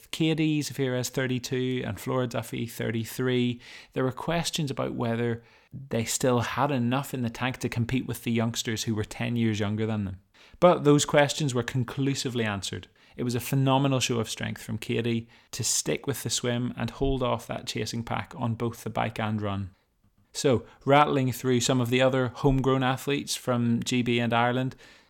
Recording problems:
none

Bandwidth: 17 kHz